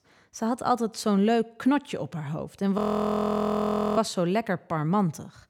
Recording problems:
audio freezing; at 3 s for 1 s

